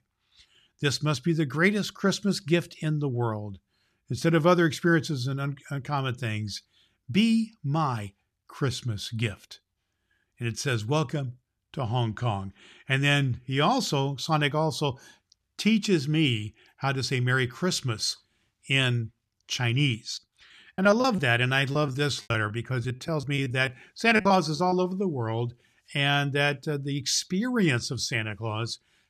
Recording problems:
choppy; very; from 20 to 25 s; 17% of the speech affected

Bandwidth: 14 kHz